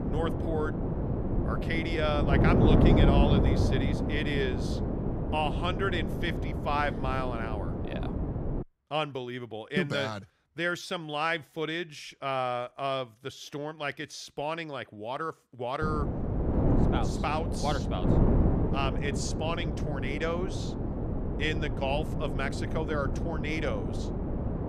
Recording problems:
wind noise on the microphone; heavy; until 8.5 s and from 16 s on; 3 dB below the speech

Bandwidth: 15.5 kHz